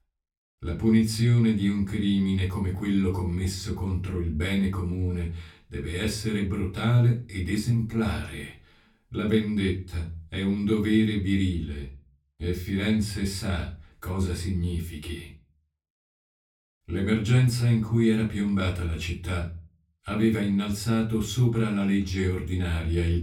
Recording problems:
off-mic speech; far
room echo; very slight; dies away in 0.3 s

